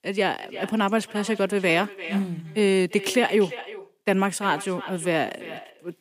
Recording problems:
echo of what is said; noticeable; throughout; 350 ms later, 15 dB below the speech

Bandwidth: 15 kHz